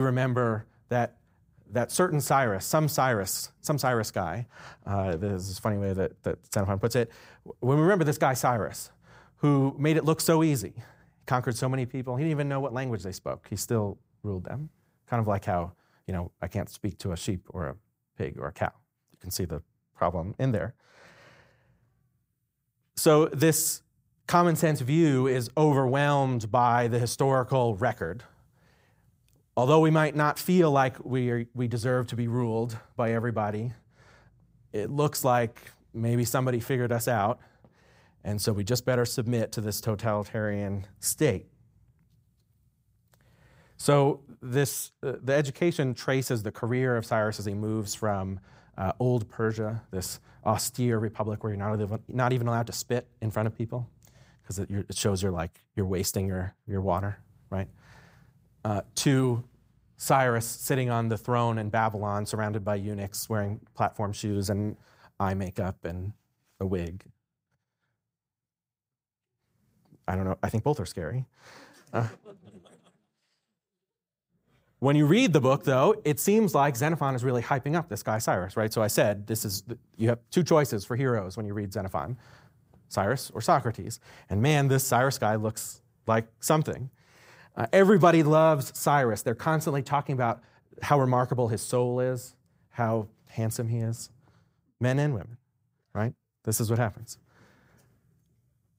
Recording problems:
abrupt cut into speech; at the start

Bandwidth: 15.5 kHz